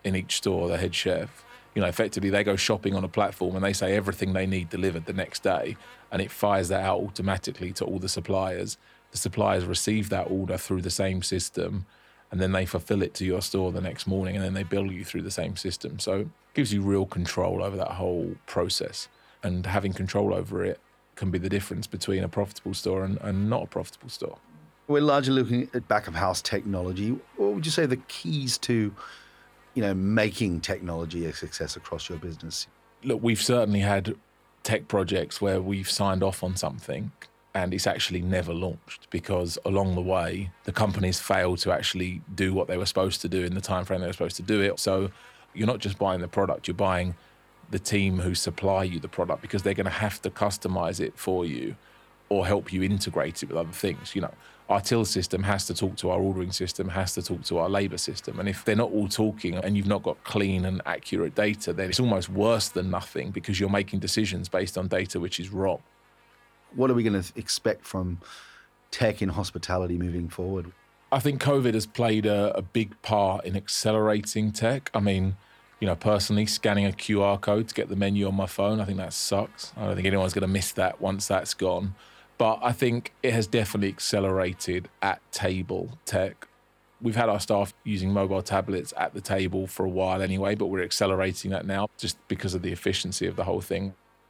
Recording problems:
electrical hum; faint; throughout; 50 Hz, 30 dB below the speech

